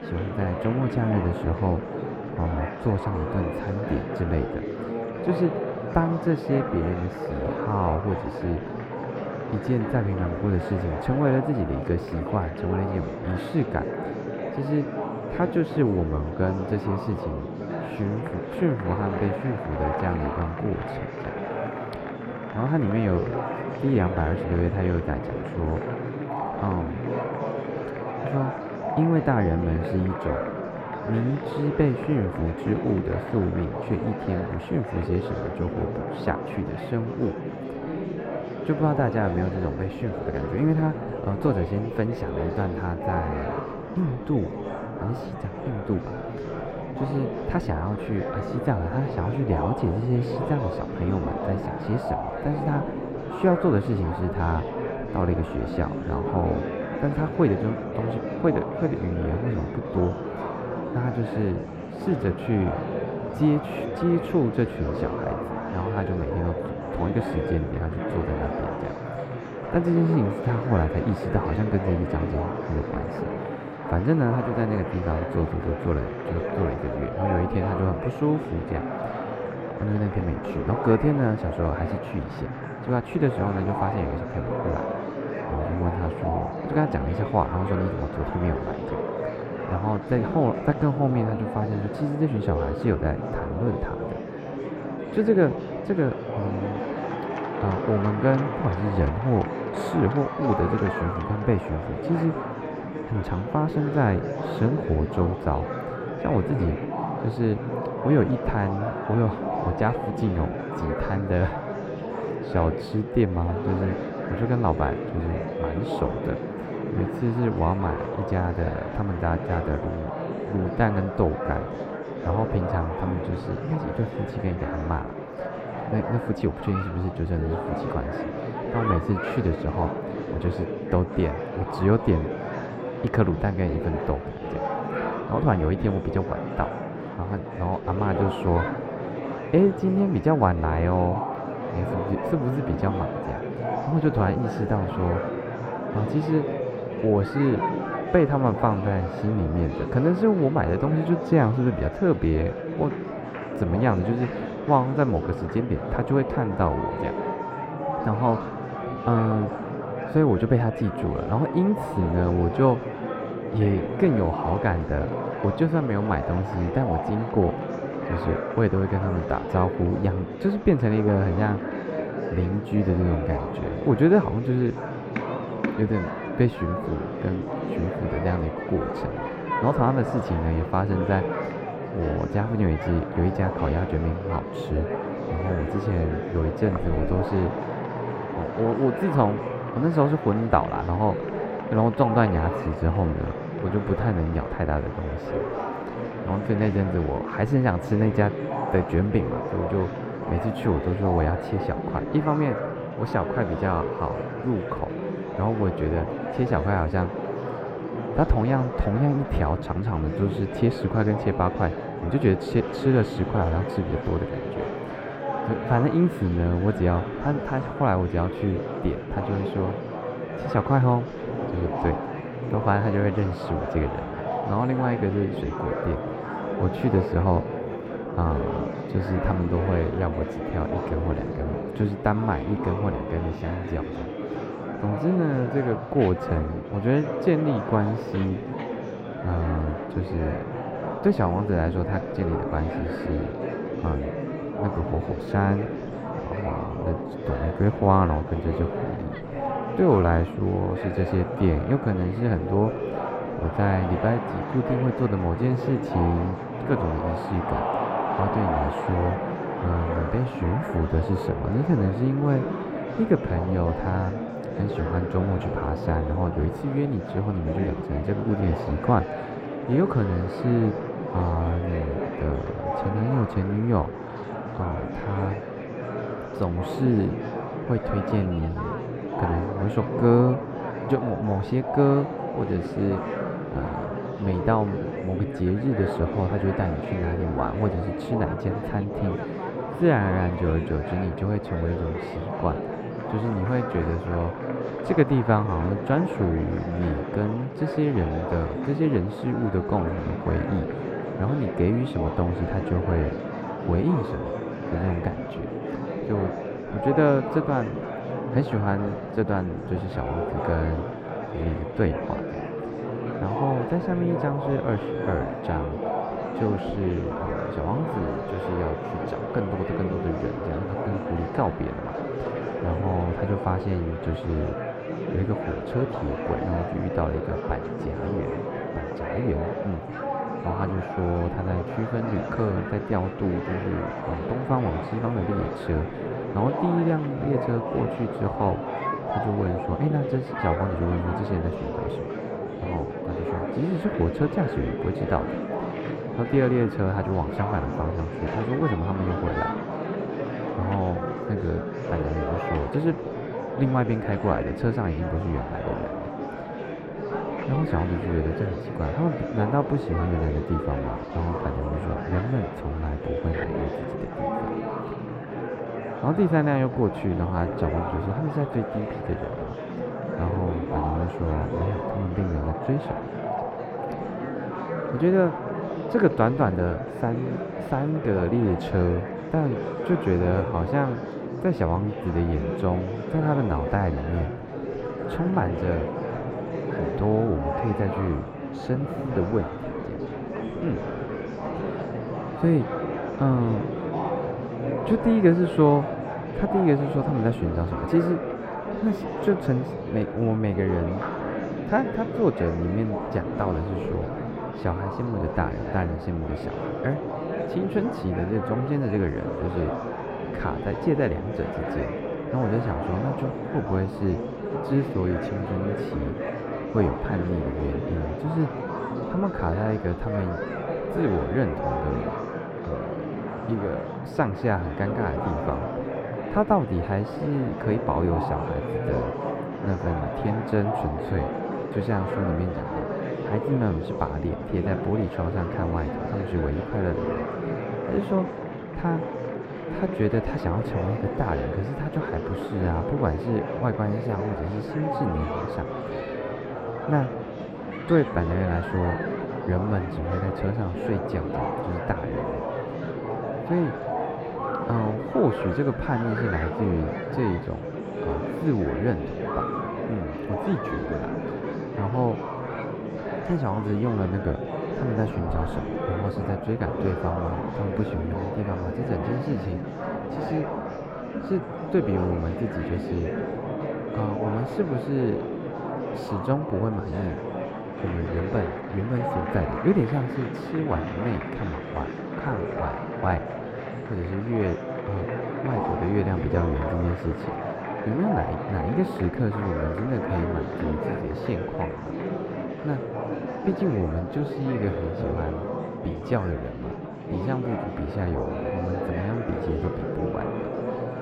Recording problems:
muffled; very; fading above 3 kHz
murmuring crowd; loud; throughout; 4 dB below the speech

